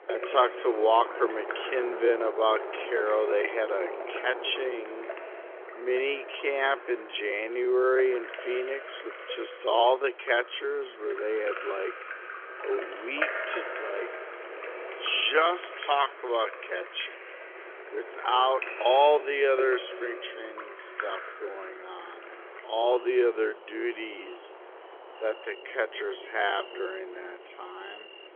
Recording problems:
wrong speed, natural pitch; too slow; 0.6 times normal speed
phone-call audio; nothing above 3.5 kHz
rain or running water; noticeable; throughout; 10 dB below the speech
wind noise on the microphone; occasional gusts; 15 dB below the speech
traffic noise; faint; from 22 s on; 25 dB below the speech

